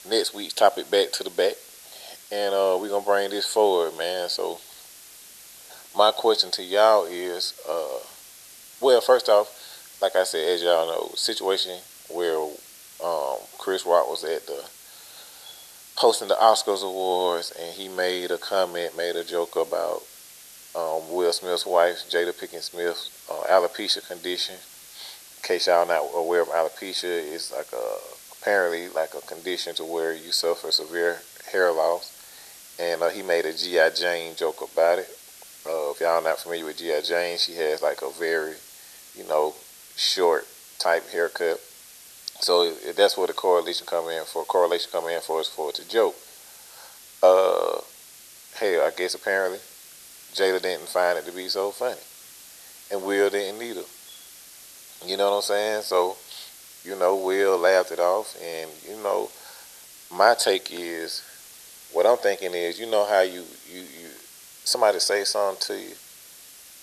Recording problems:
thin; very; fading below 400 Hz
hiss; noticeable; throughout; 20 dB below the speech

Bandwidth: 13.5 kHz